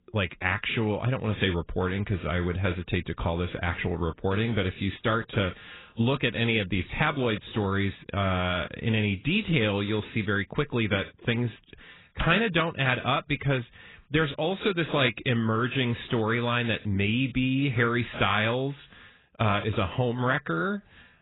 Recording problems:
garbled, watery; badly; nothing above 4 kHz

